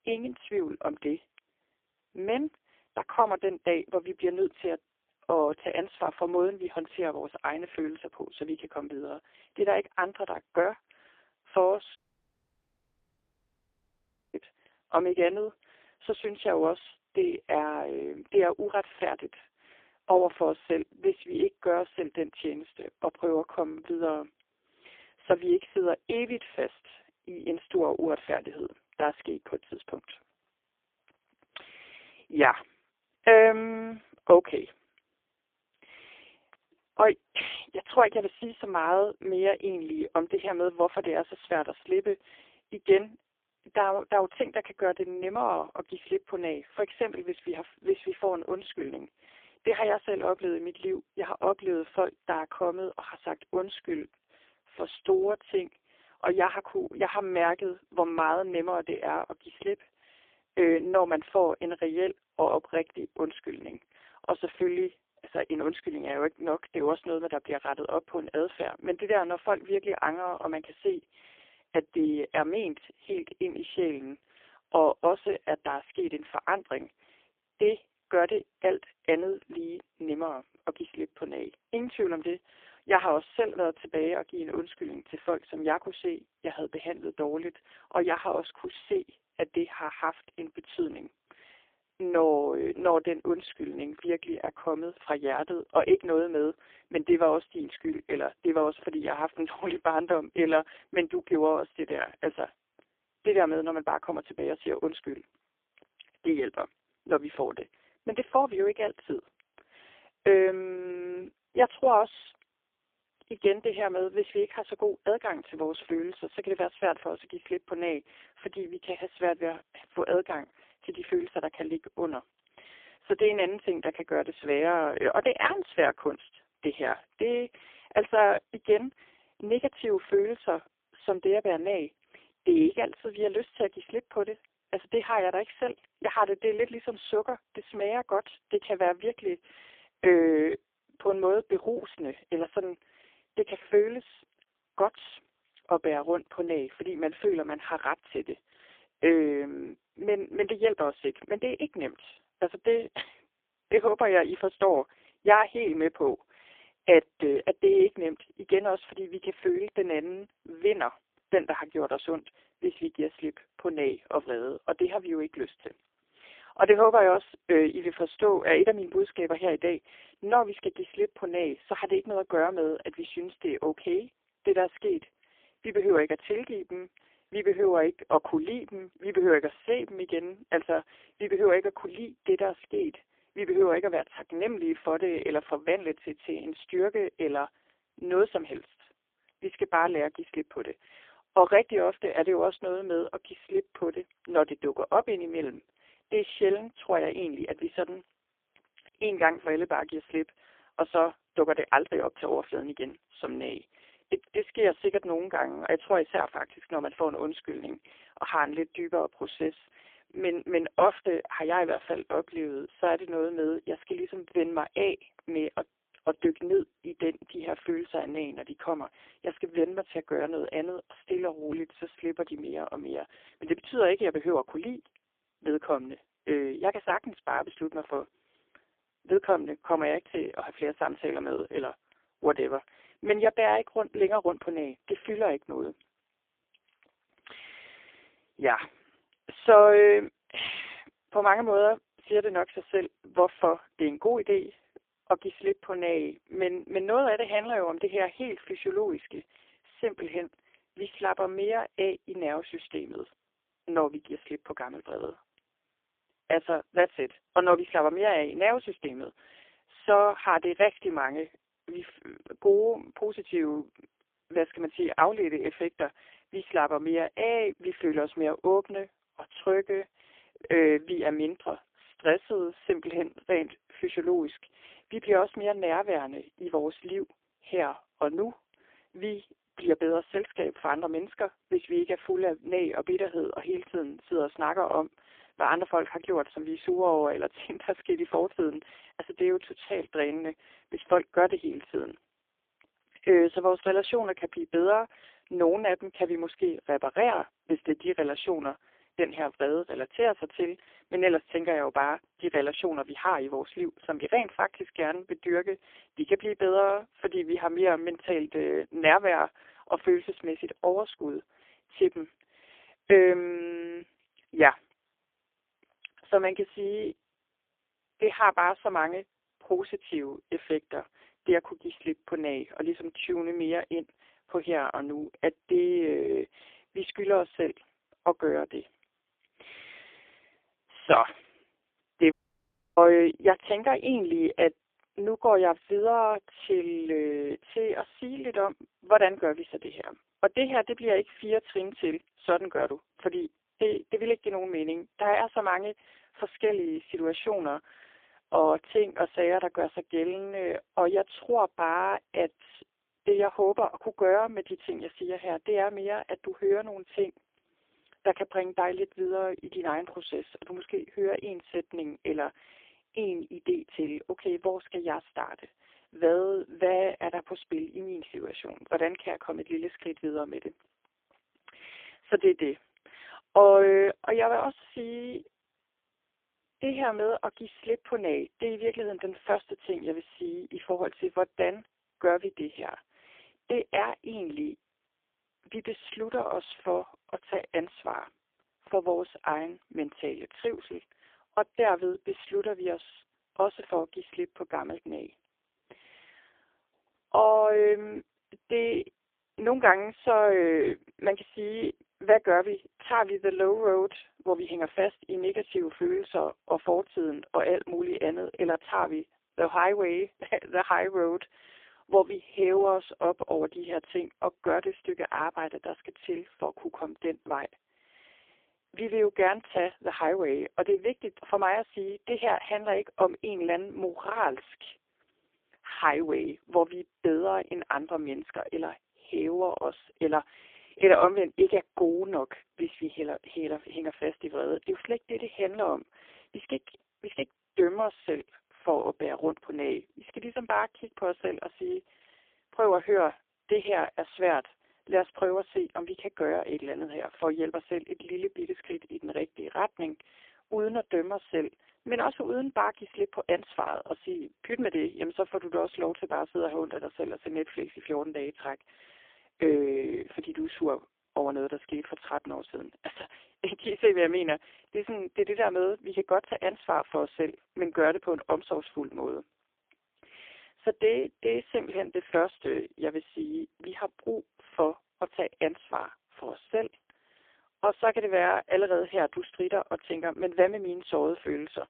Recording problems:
phone-call audio; poor line; nothing above 3 kHz
audio cutting out; at 12 s for 2.5 s and at 5:32 for 0.5 s

